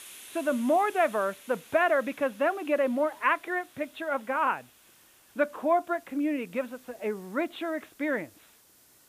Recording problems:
high frequencies cut off; severe; nothing above 4 kHz
hiss; faint; throughout; 20 dB below the speech

